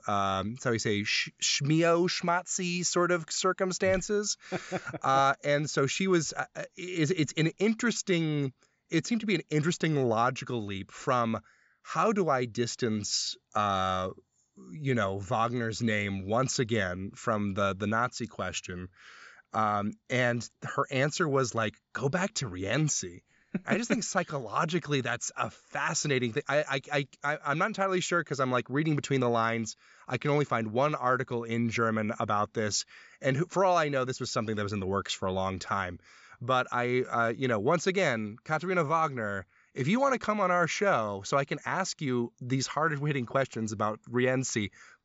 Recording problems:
high frequencies cut off; noticeable; nothing above 8 kHz

